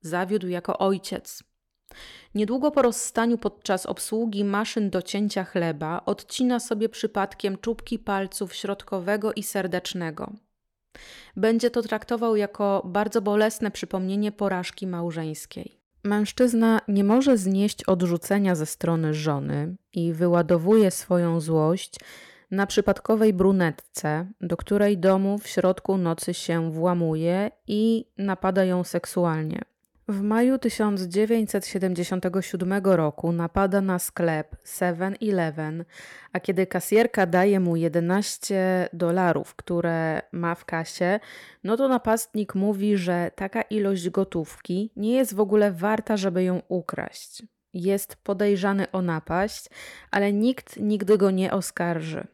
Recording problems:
none

